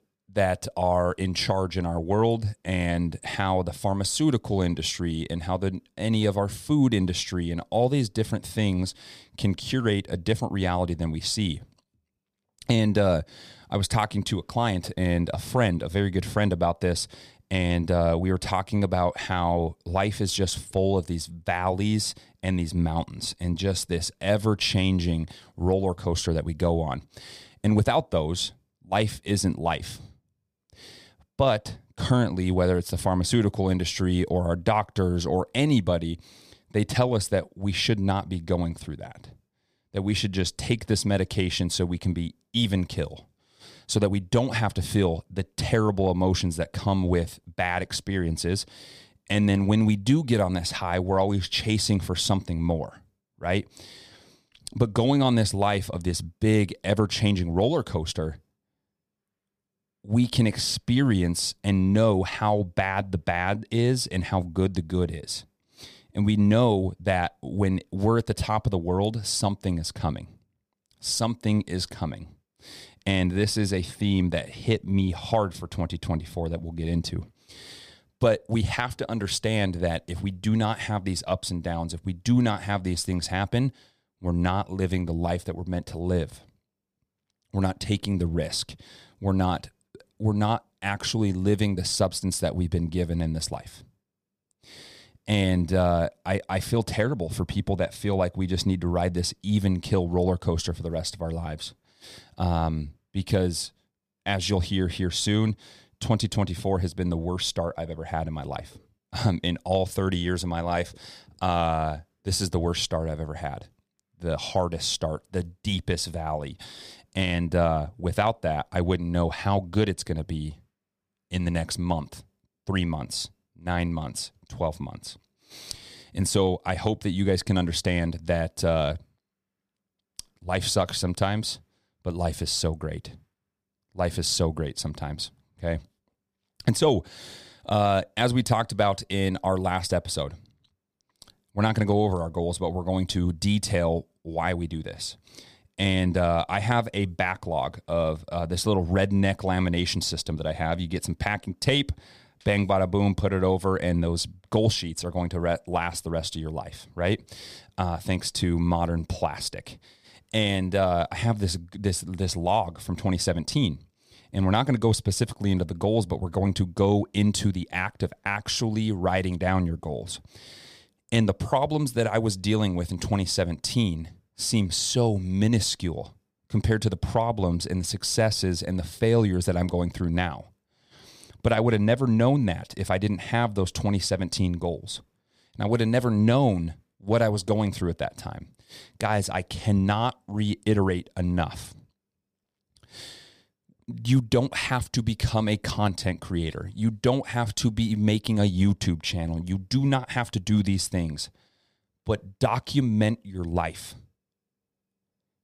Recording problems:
none

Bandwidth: 15 kHz